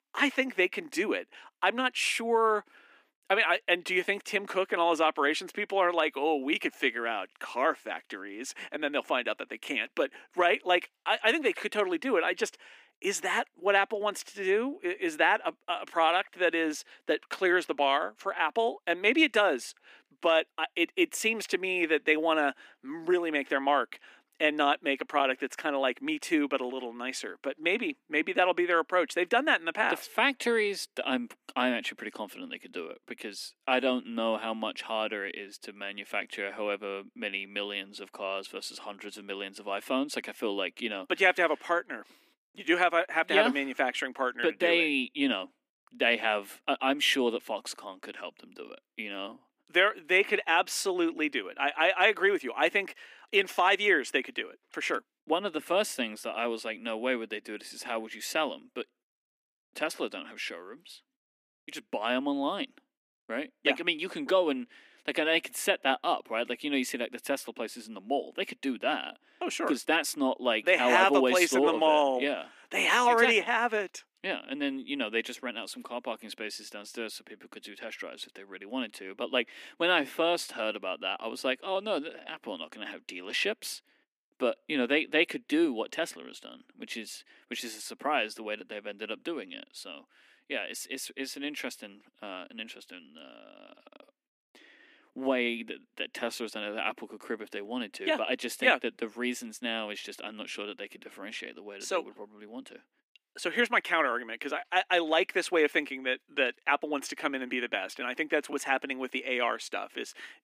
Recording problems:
thin; somewhat; fading below 250 Hz

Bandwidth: 15 kHz